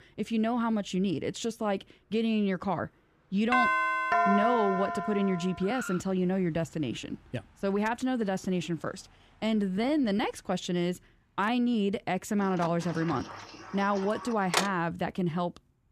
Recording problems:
traffic noise; noticeable; throughout; 20 dB below the speech
doorbell; loud; from 3.5 to 5.5 s; peak 5 dB above the speech
door banging; loud; from 13 to 15 s; peak 1 dB above the speech

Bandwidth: 14.5 kHz